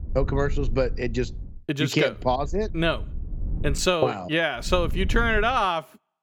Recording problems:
wind noise on the microphone; occasional gusts; until 1.5 s, from 2 to 4 s and at 4.5 s; 25 dB below the speech

